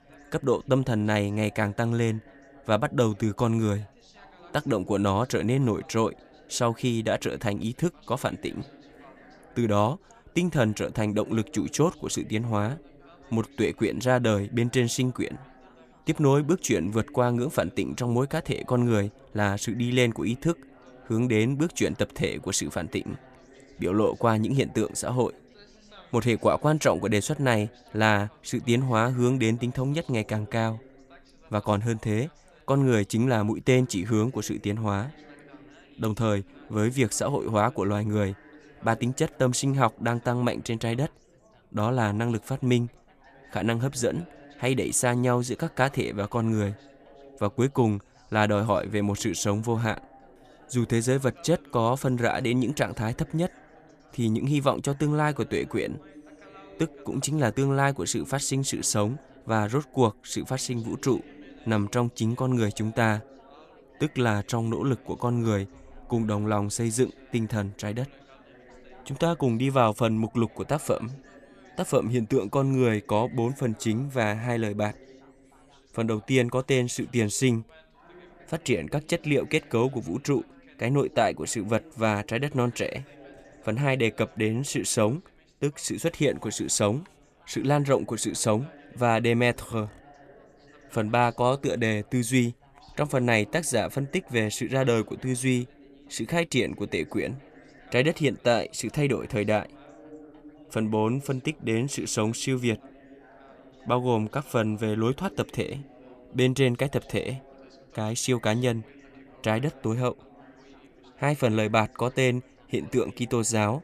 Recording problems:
background chatter; faint; throughout; 4 voices, 25 dB below the speech

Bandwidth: 14.5 kHz